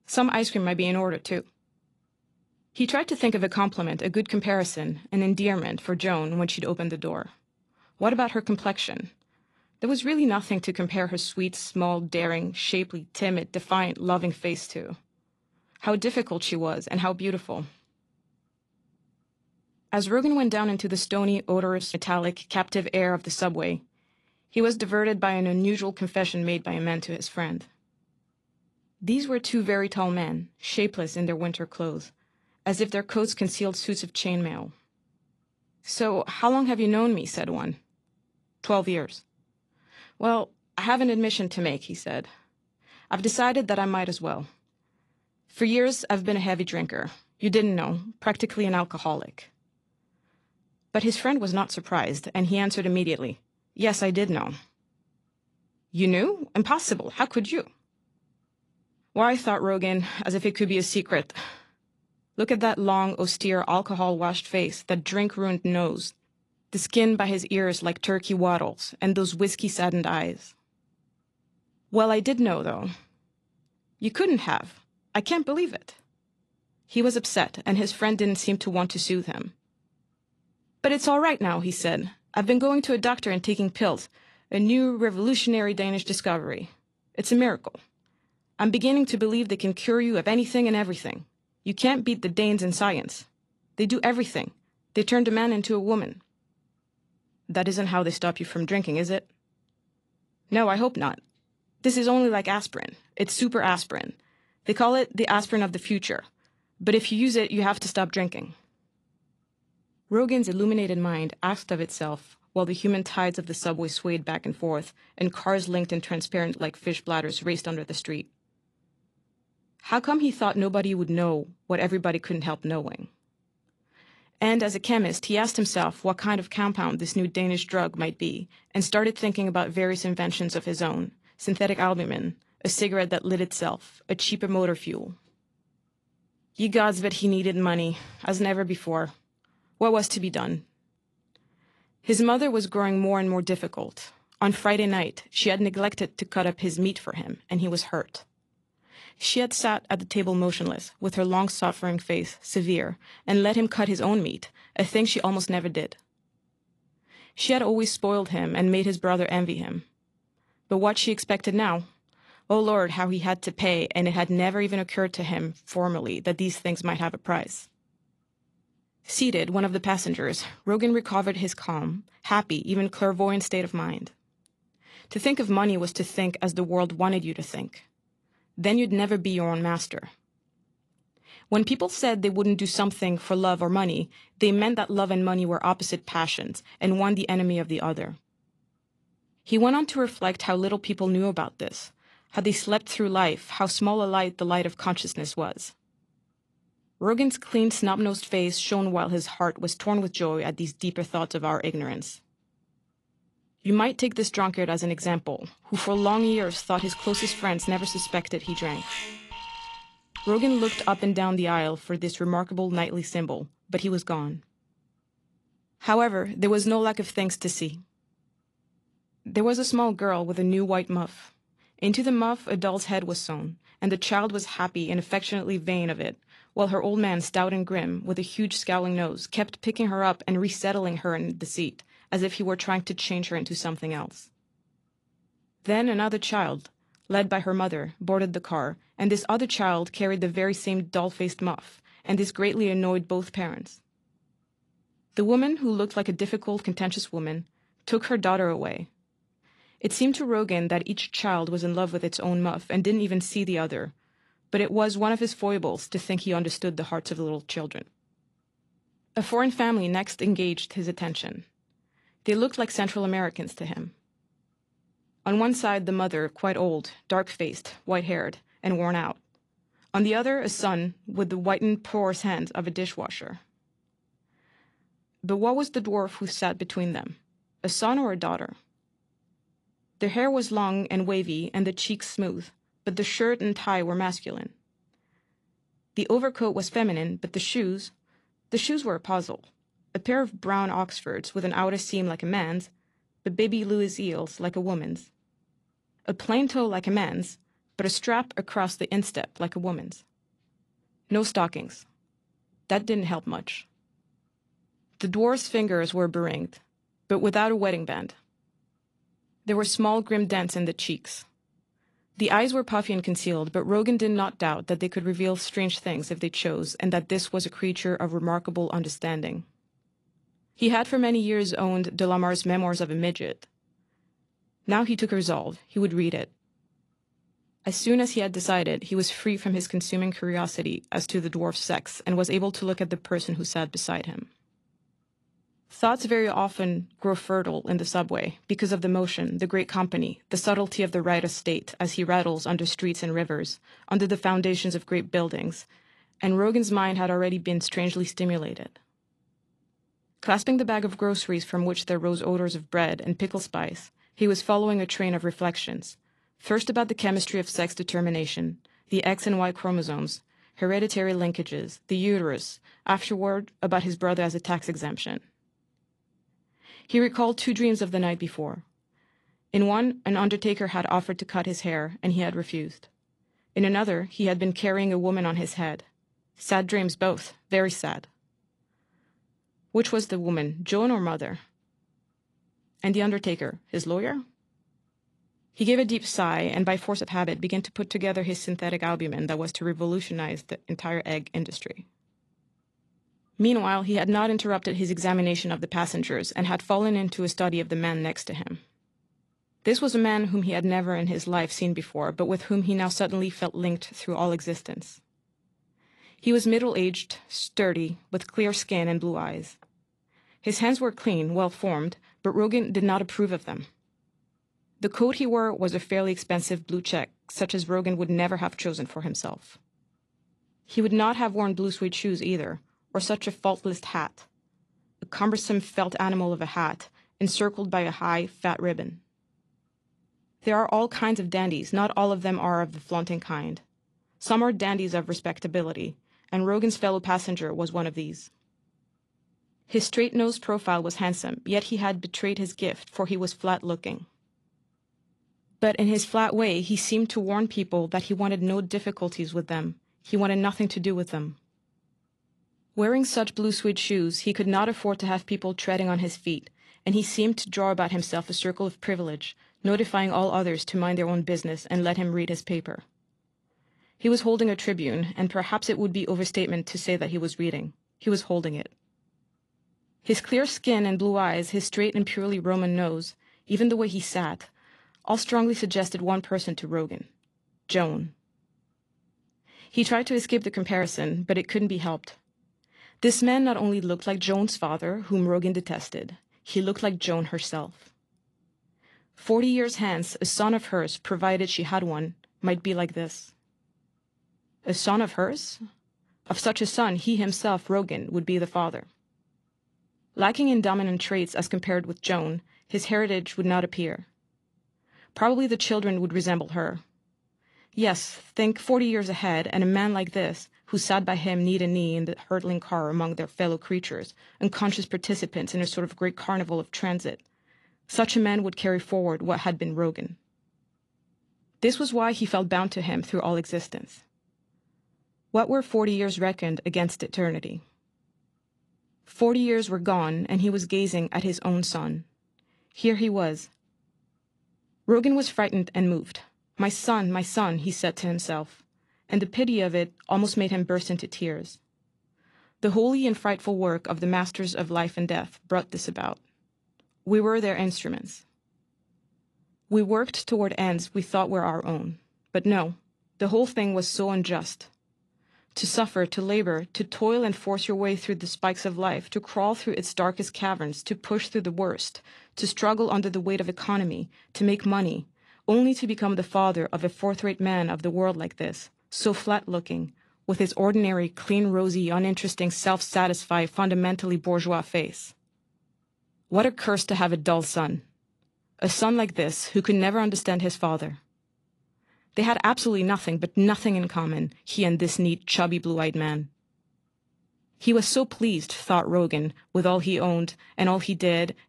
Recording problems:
garbled, watery; slightly; nothing above 11 kHz
alarm; noticeable; from 3:26 to 3:31; peak 6 dB below the speech

